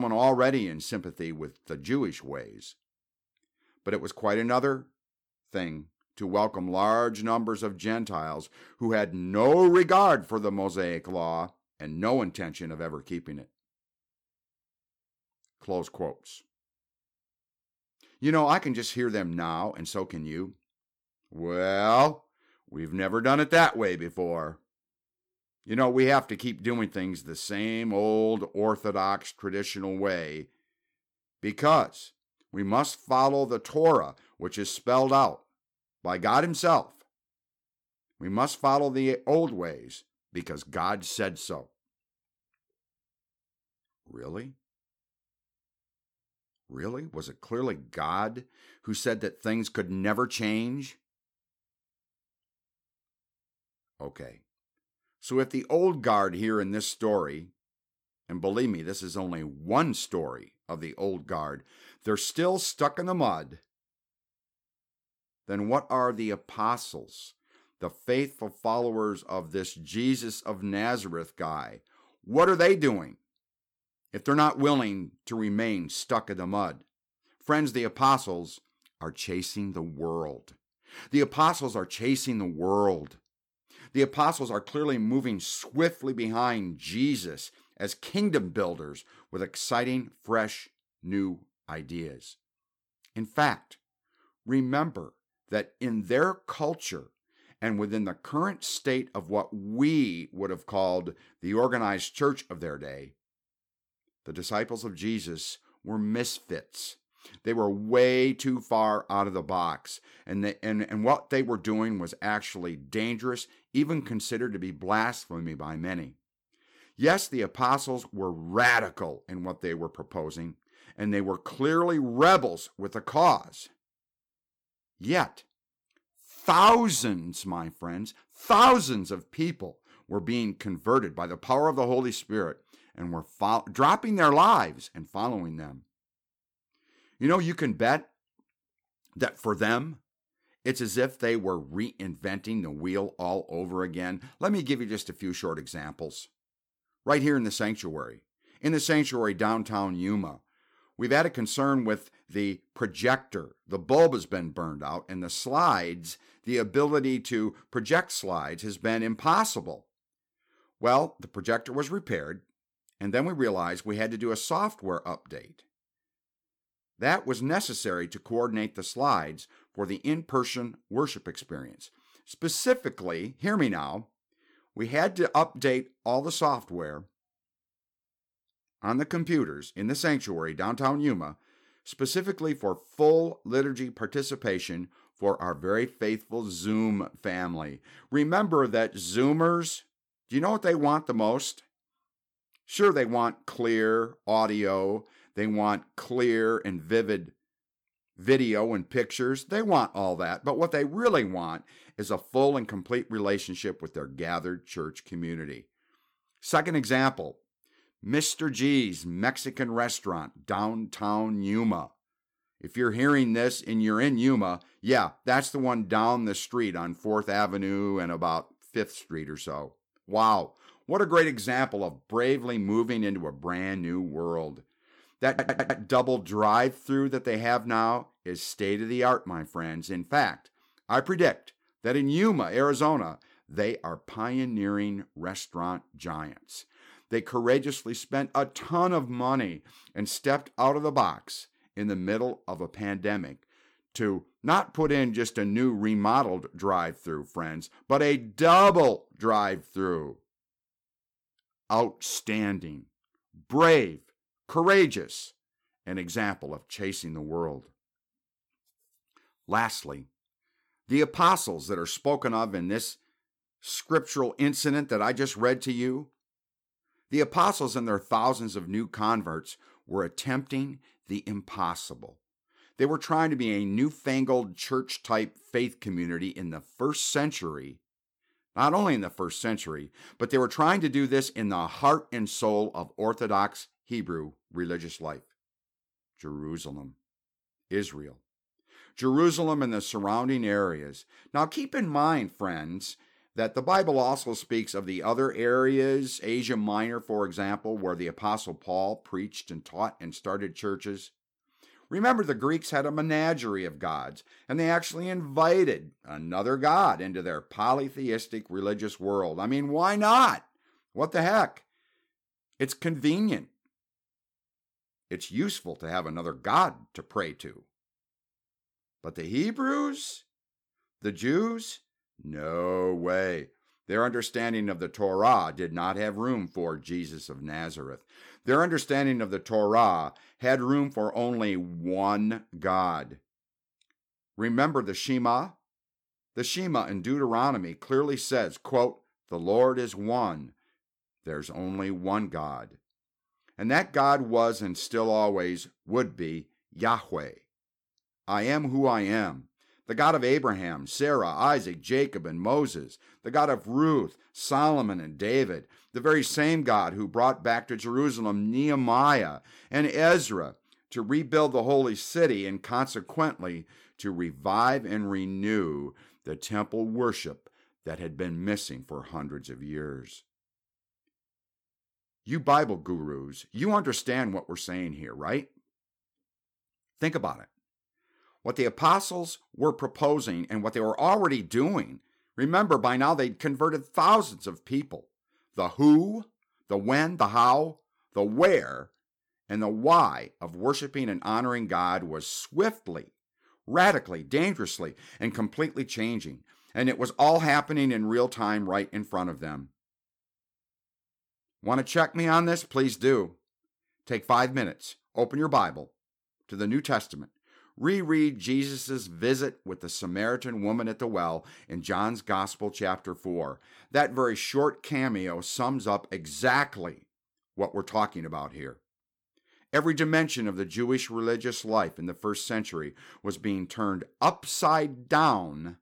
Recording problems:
abrupt cut into speech; at the start
audio stuttering; at 3:45

